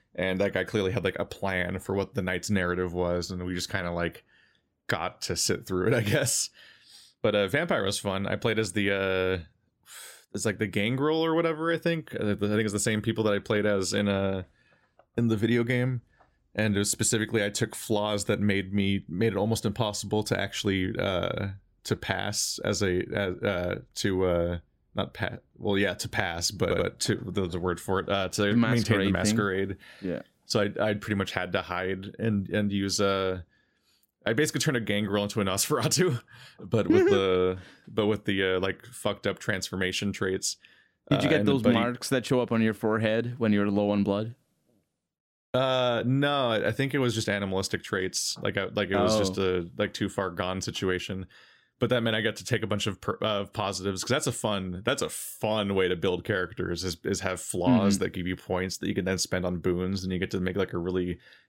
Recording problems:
audio stuttering; at 27 s

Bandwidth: 16 kHz